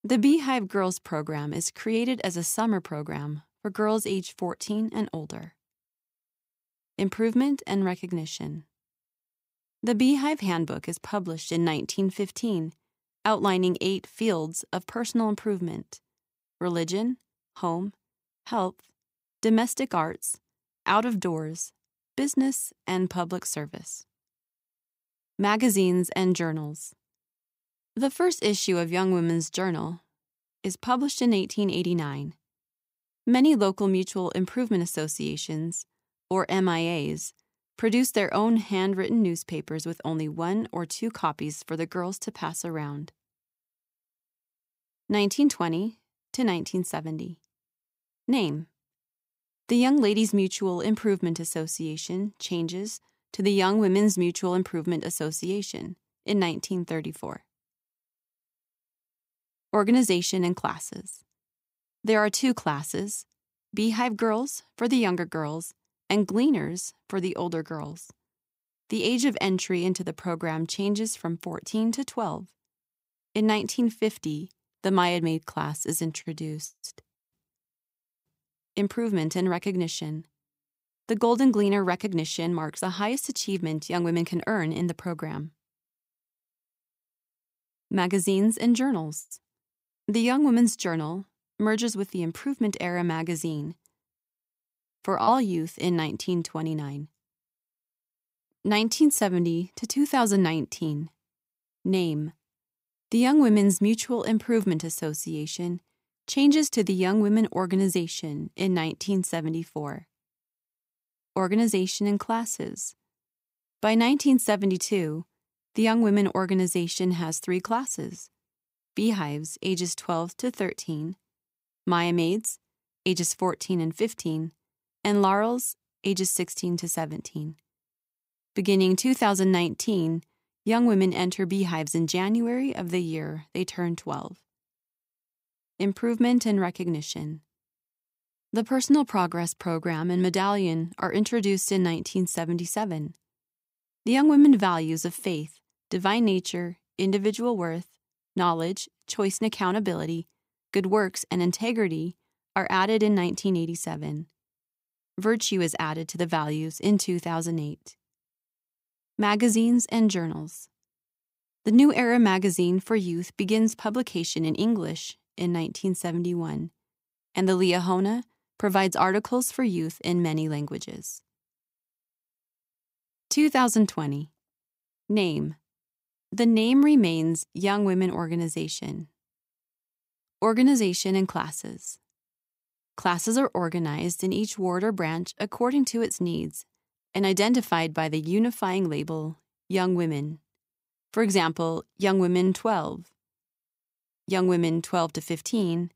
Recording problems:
none

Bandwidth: 15.5 kHz